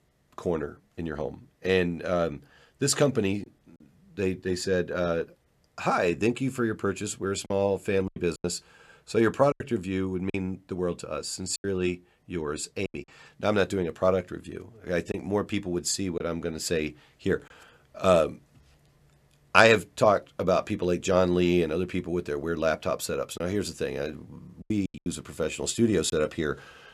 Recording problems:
choppy; occasionally; 4% of the speech affected

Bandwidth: 14.5 kHz